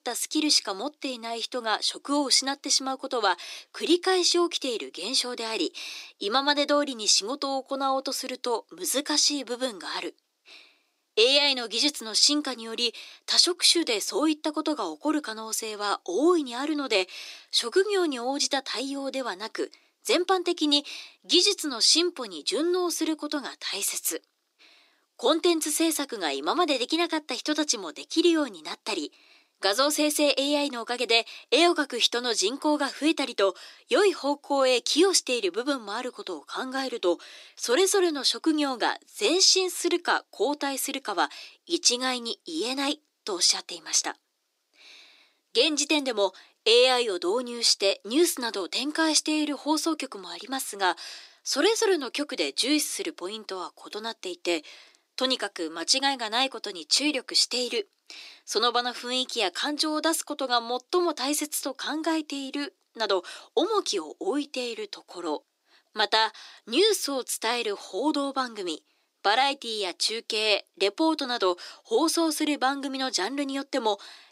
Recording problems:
thin; somewhat; fading below 300 Hz
uneven, jittery; slightly; from 1 s to 1:05

